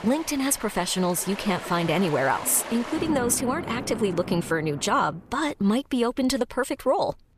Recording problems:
rain or running water; noticeable; until 5 s; 10 dB below the speech

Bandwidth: 14.5 kHz